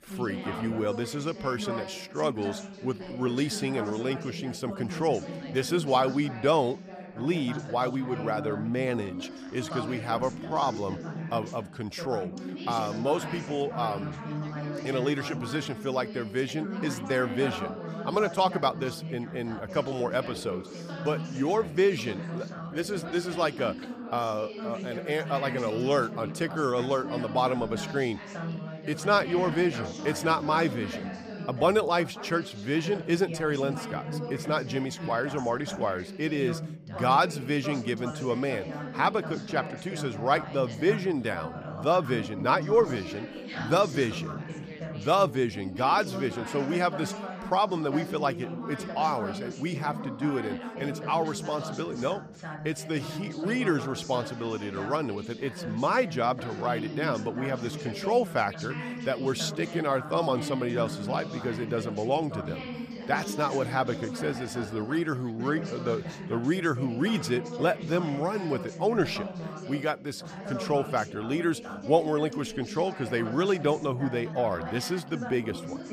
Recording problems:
background chatter; loud; throughout; 3 voices, 8 dB below the speech
uneven, jittery; slightly; from 10 s to 1:14

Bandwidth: 15 kHz